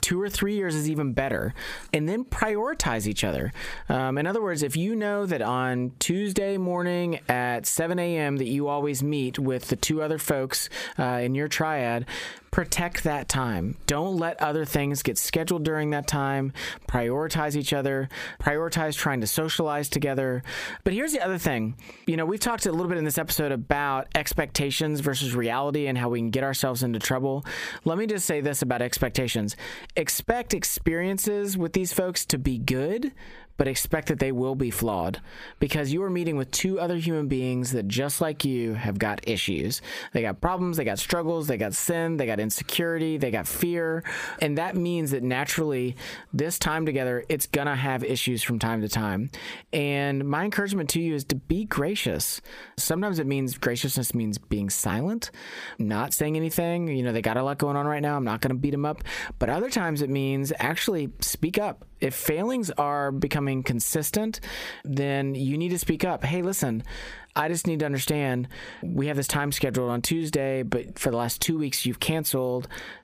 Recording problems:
squashed, flat; heavily

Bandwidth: 15 kHz